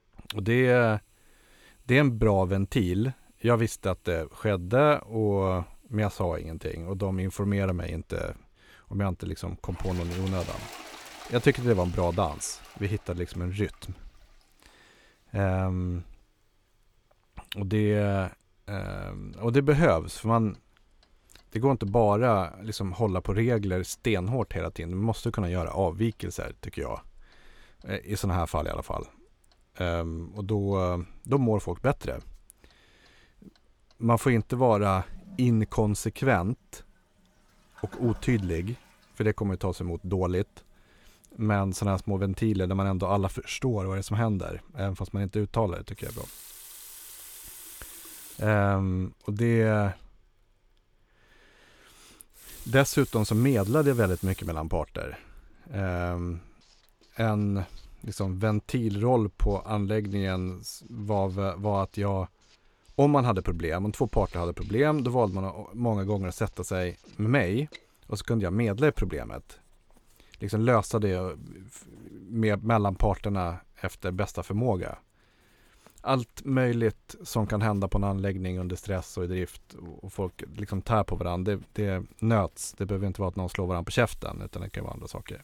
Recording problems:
household noises; noticeable; throughout; 20 dB below the speech

